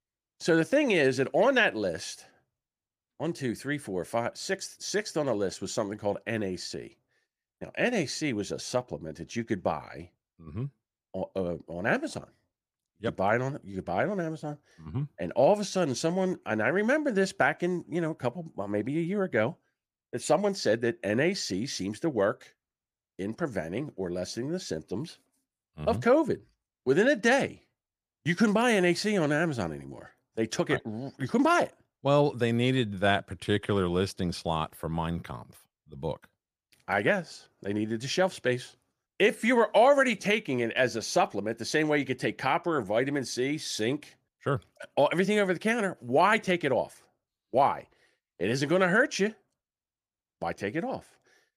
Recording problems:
none

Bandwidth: 15 kHz